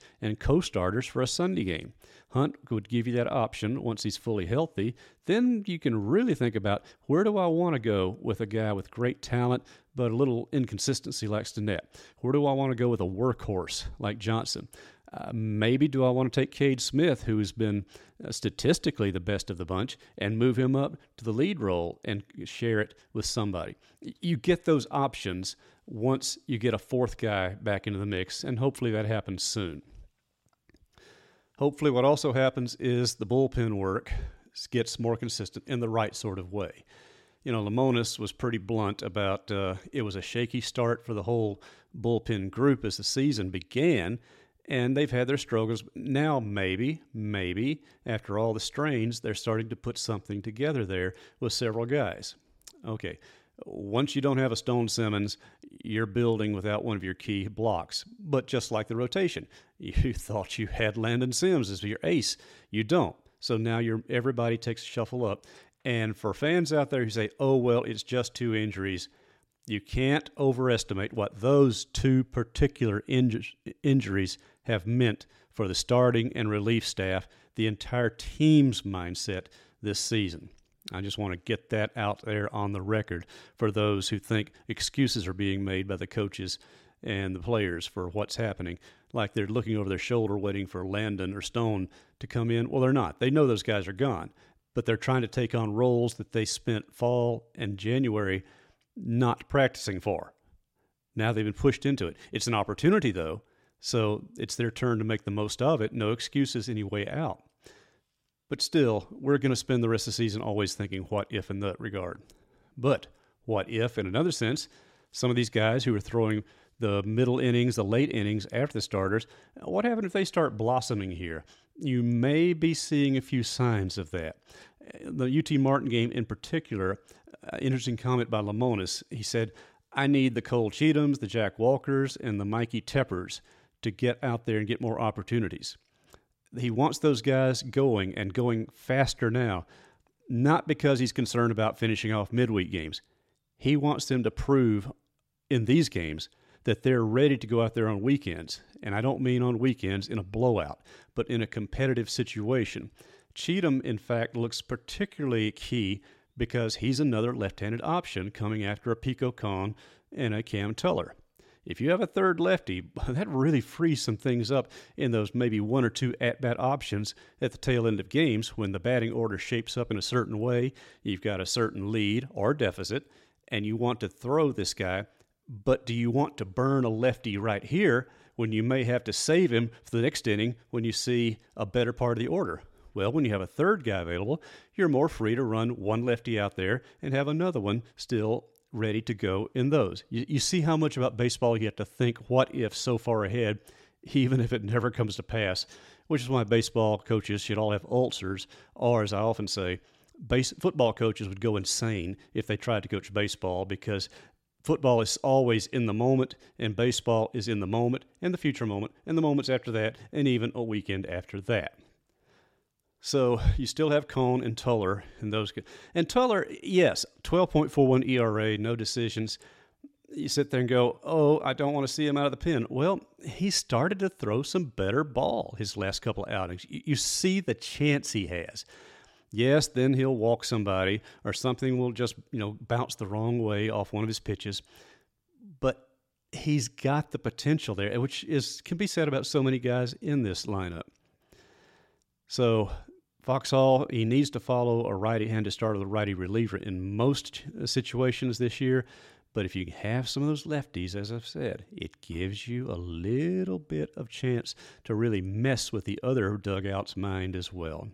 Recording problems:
none

